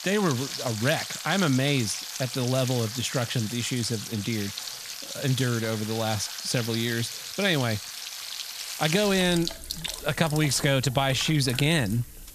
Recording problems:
household noises; loud; throughout; 8 dB below the speech
hiss; faint; throughout; 20 dB below the speech

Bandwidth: 14.5 kHz